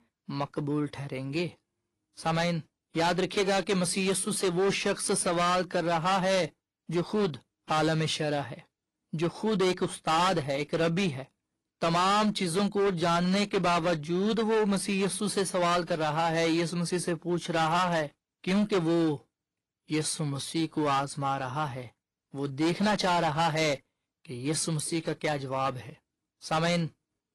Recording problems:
distortion; heavy; 12% of the sound clipped
garbled, watery; slightly

